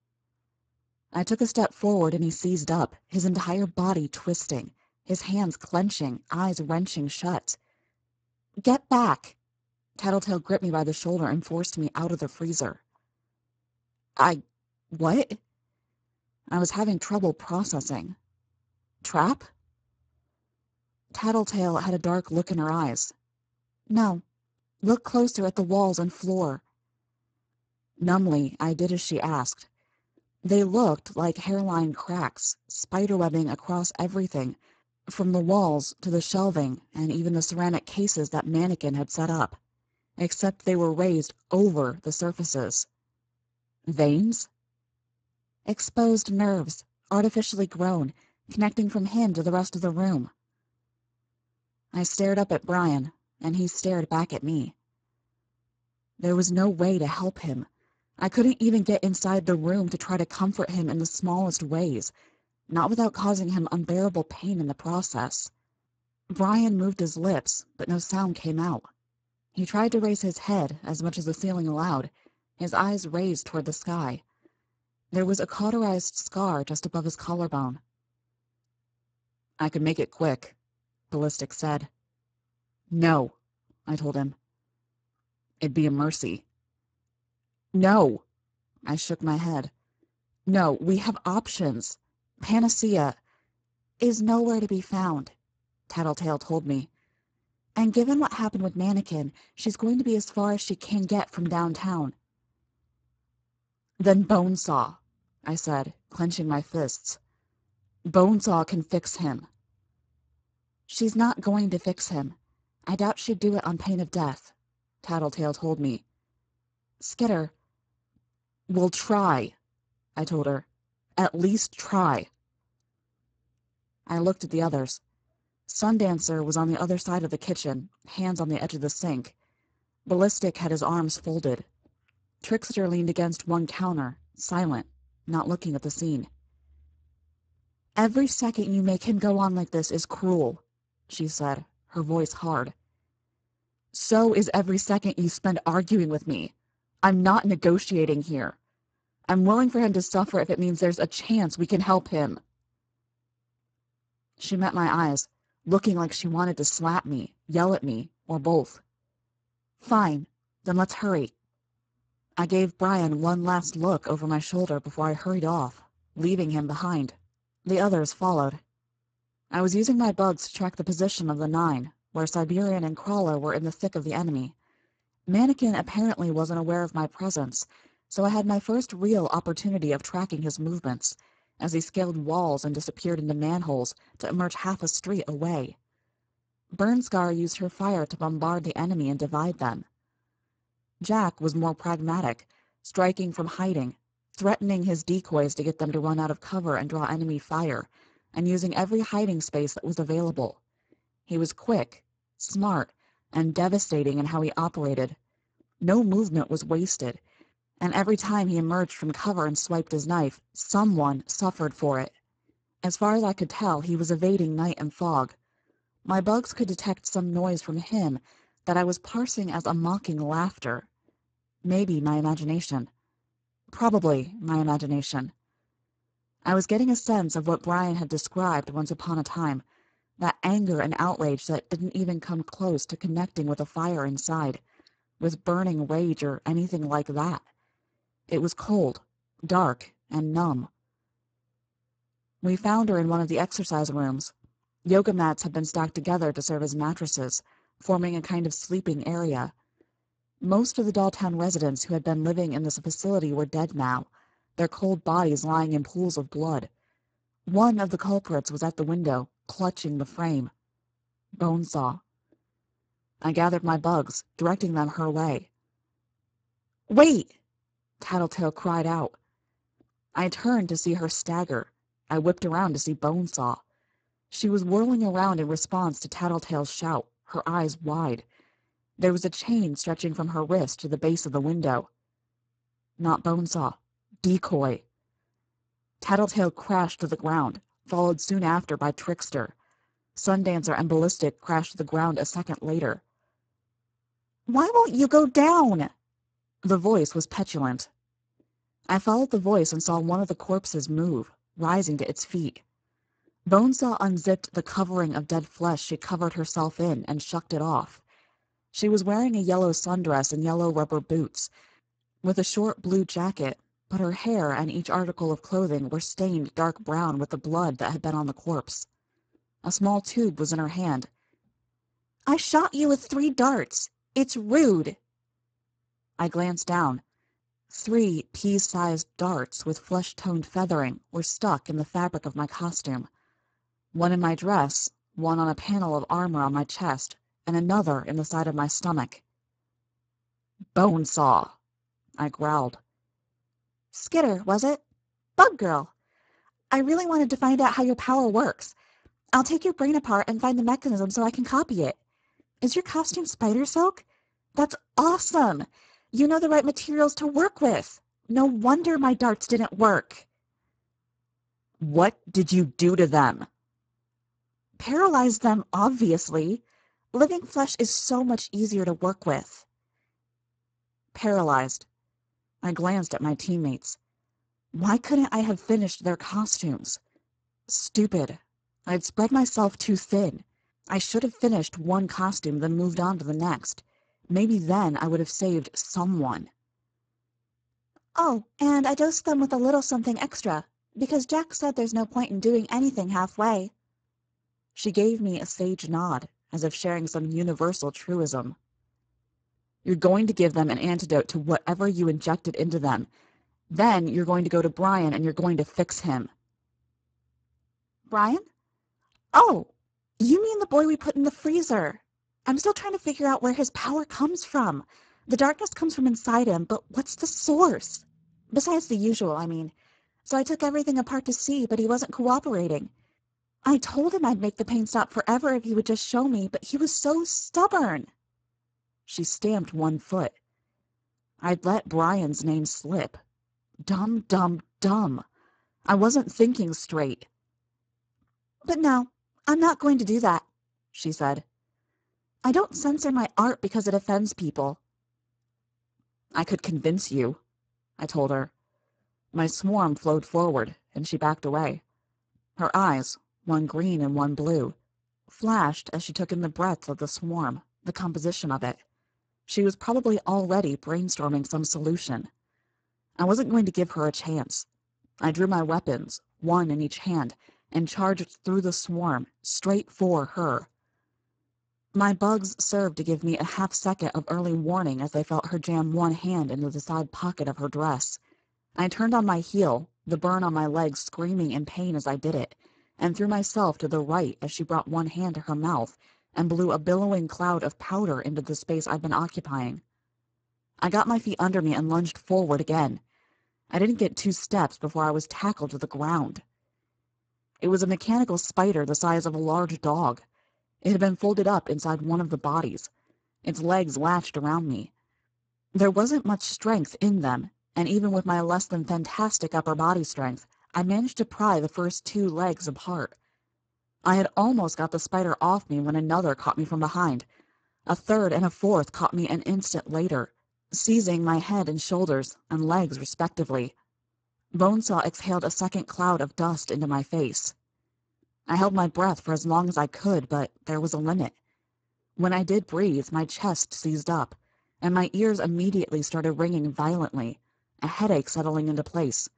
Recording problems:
garbled, watery; badly; nothing above 7.5 kHz

